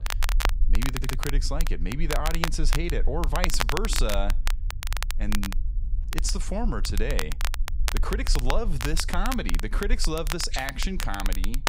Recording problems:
crackle, like an old record; loud; 3 dB below the speech
low rumble; faint; throughout; 20 dB below the speech
audio stuttering; at 1 s

